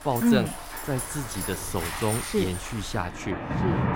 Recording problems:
rain or running water; loud; throughout; 4 dB below the speech

